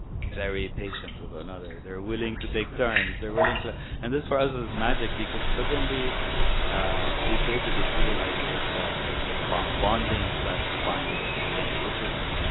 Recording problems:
garbled, watery; badly; nothing above 4 kHz
rain or running water; very loud; throughout; 4 dB above the speech
animal sounds; loud; throughout; 8 dB below the speech
wind noise on the microphone; occasional gusts; 15 dB below the speech

